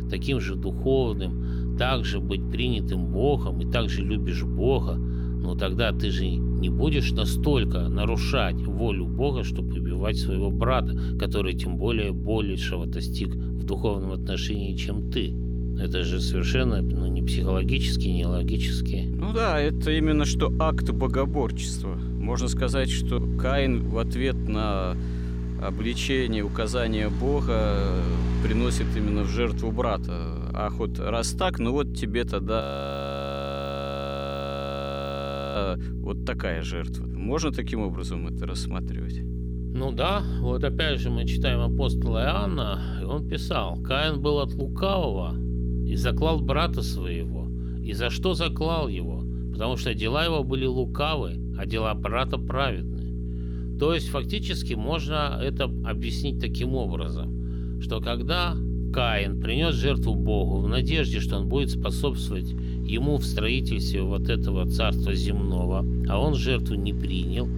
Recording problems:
electrical hum; noticeable; throughout; 60 Hz, 10 dB below the speech
traffic noise; faint; throughout; 25 dB below the speech
audio freezing; at 33 s for 3 s

